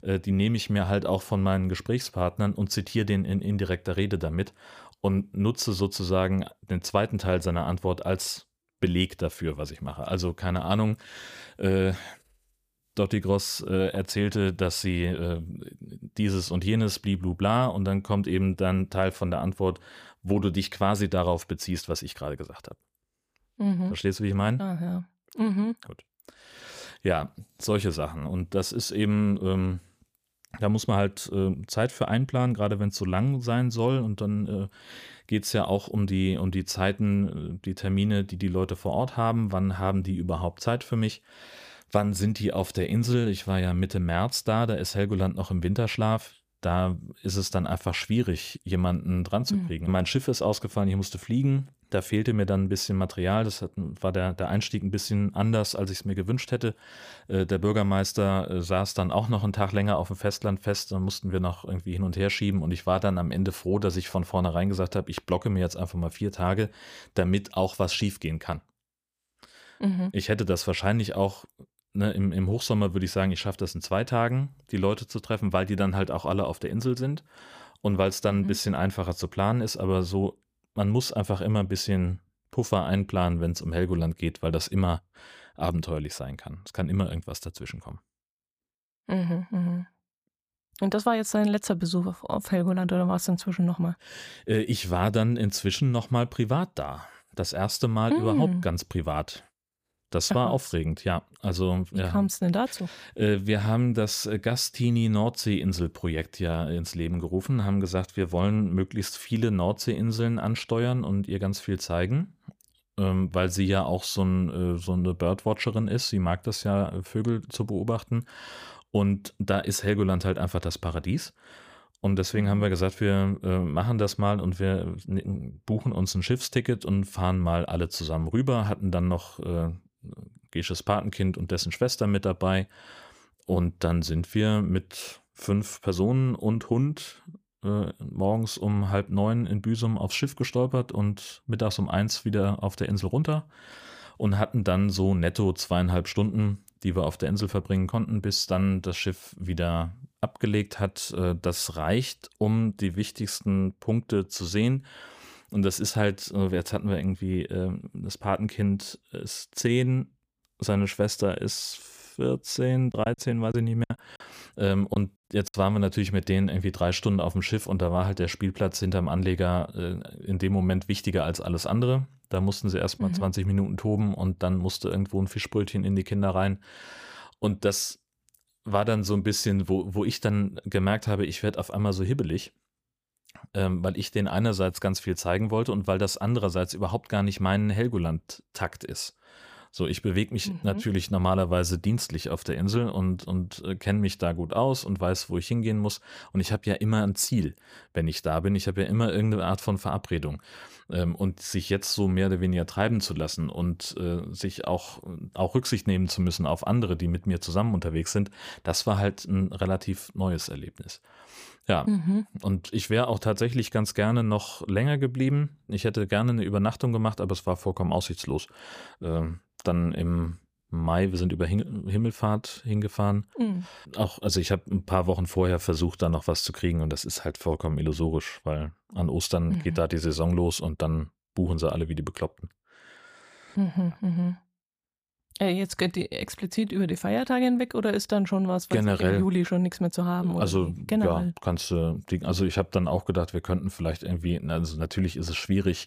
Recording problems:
choppy; very; from 2:43 to 2:46; 10% of the speech affected

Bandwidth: 15 kHz